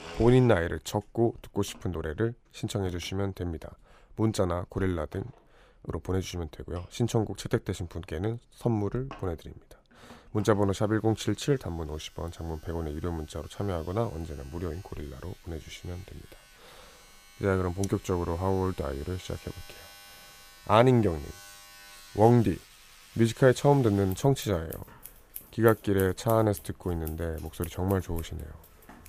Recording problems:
household noises; faint; throughout; 20 dB below the speech

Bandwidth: 15 kHz